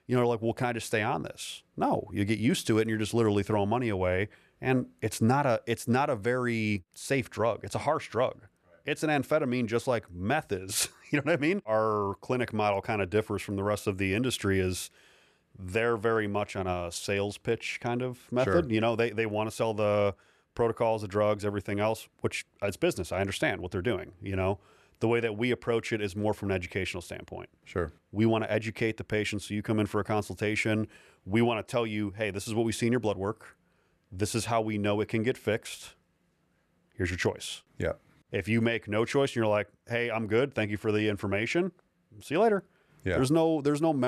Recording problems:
abrupt cut into speech; at the end

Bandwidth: 13.5 kHz